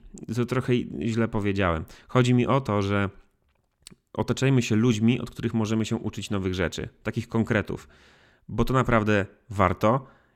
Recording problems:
none

